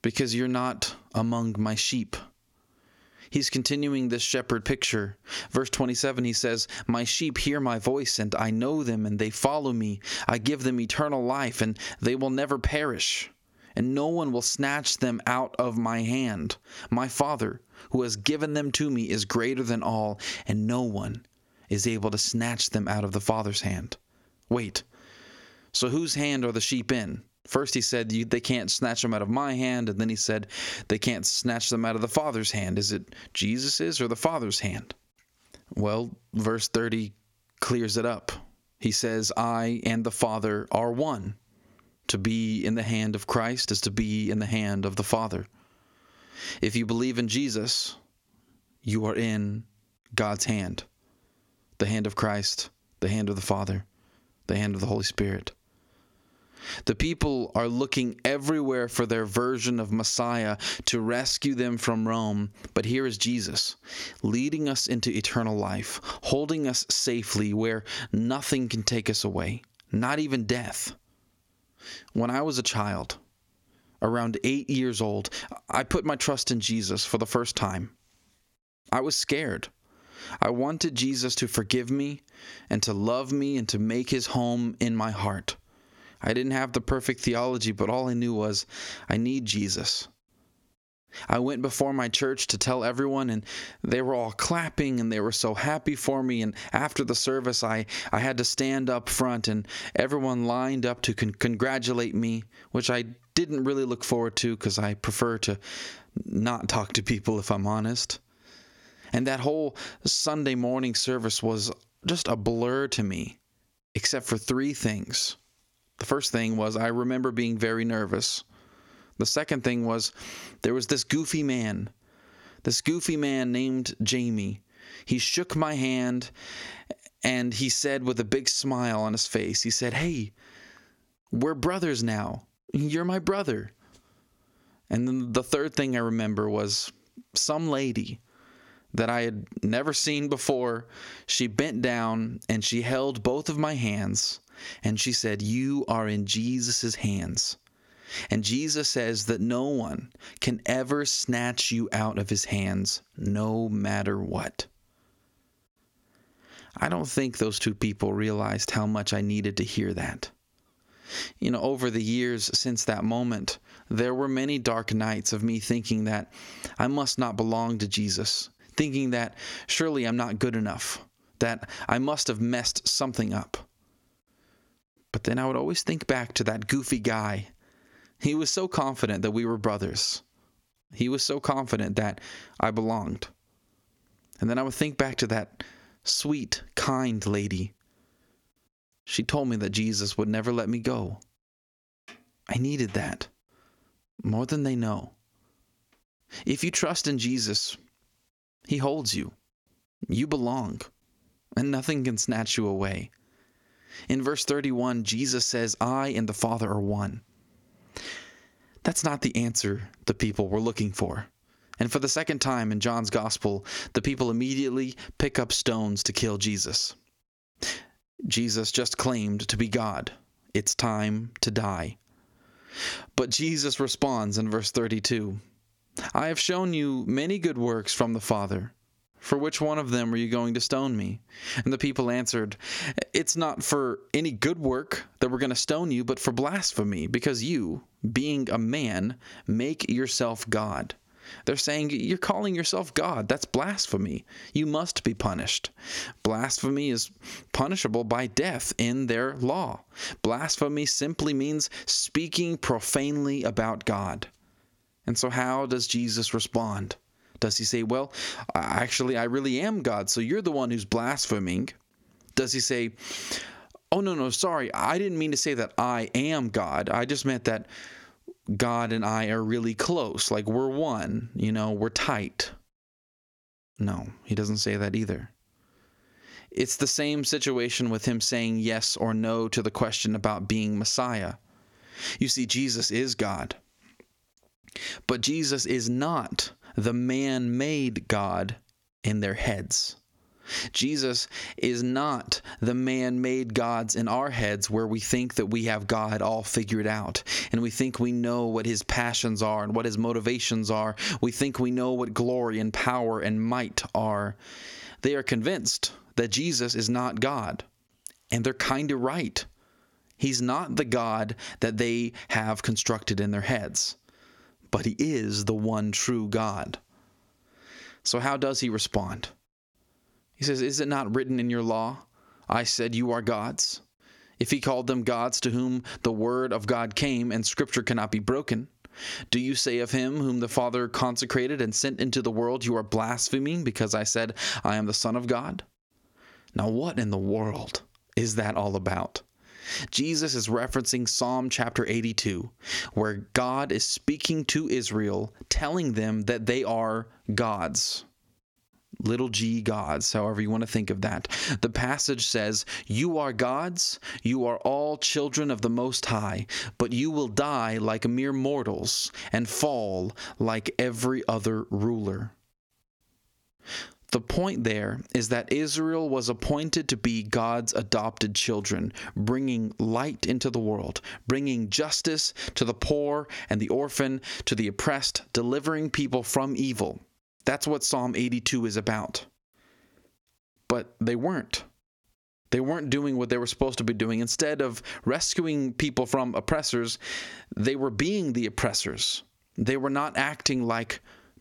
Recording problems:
squashed, flat; heavily

